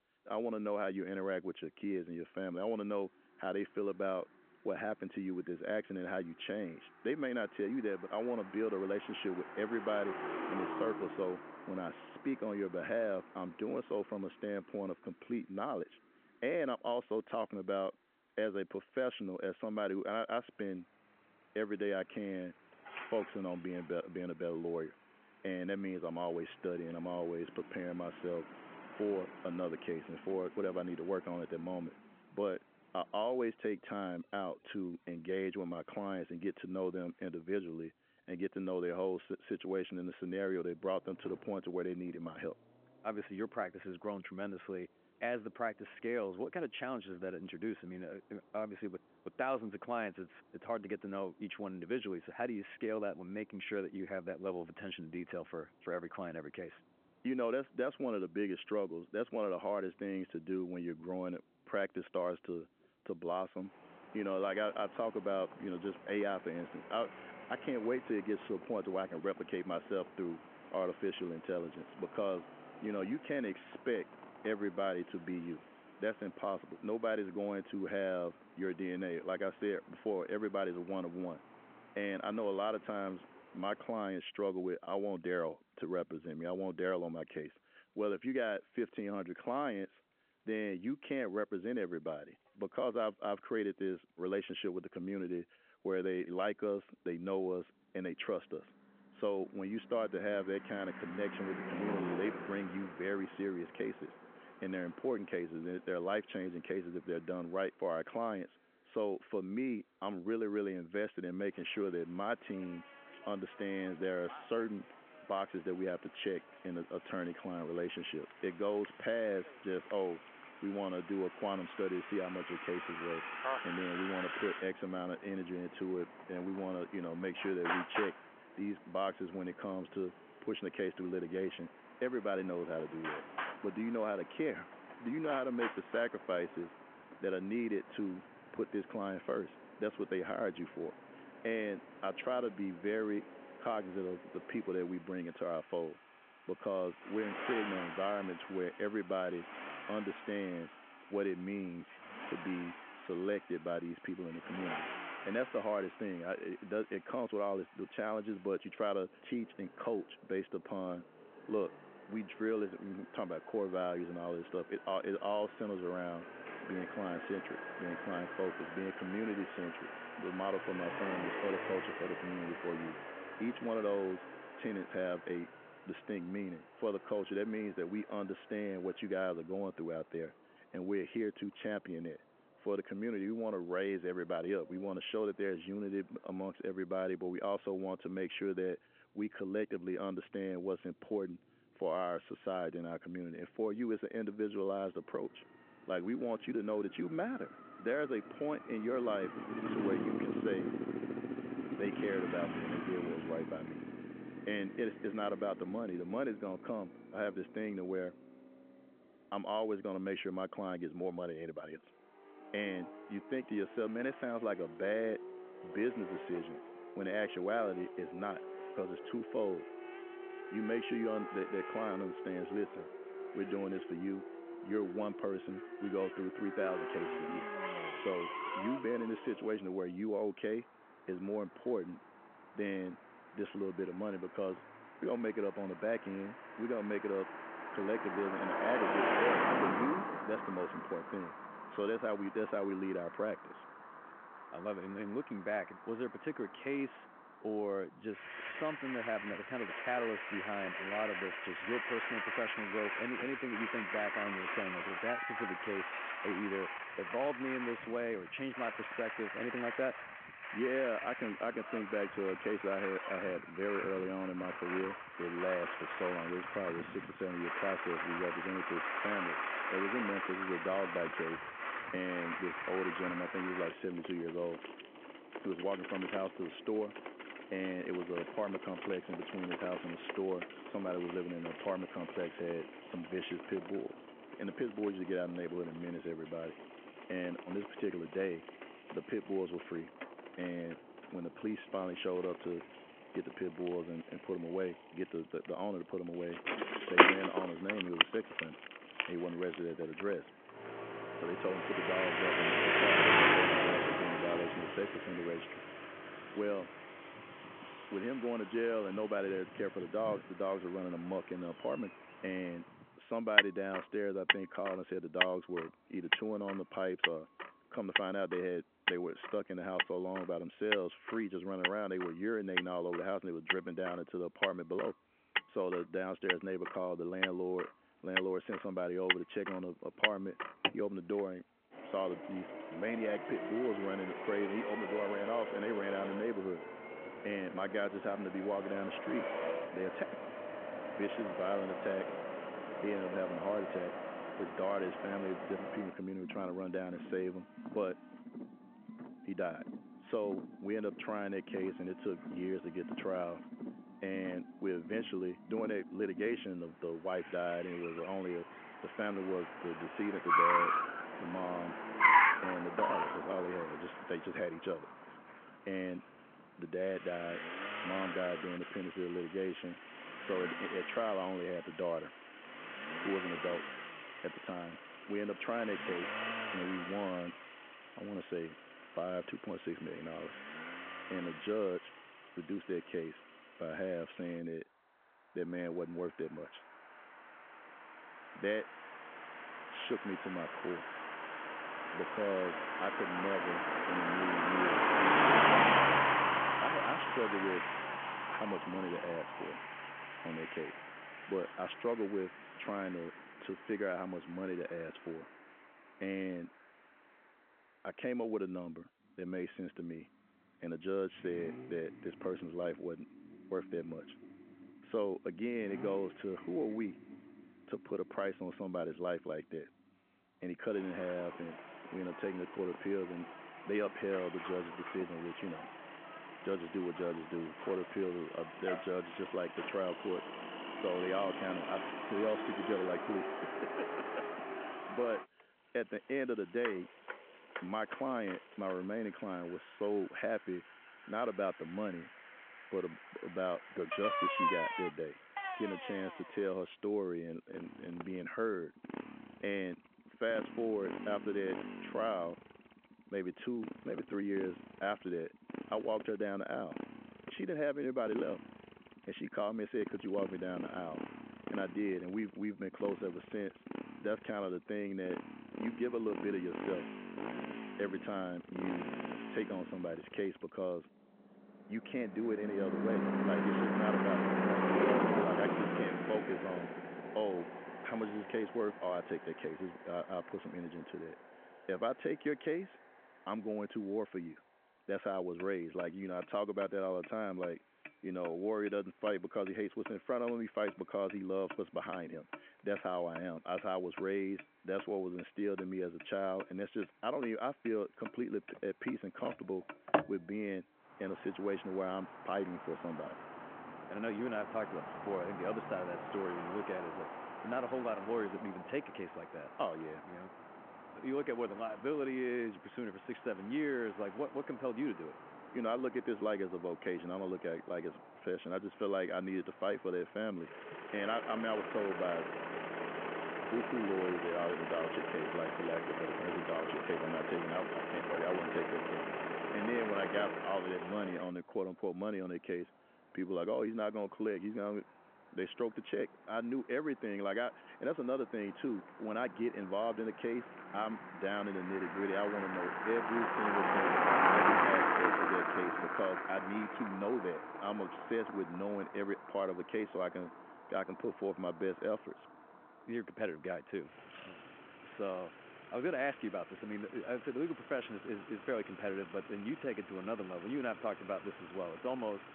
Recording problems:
phone-call audio
traffic noise; very loud; throughout; 1 dB above the speech

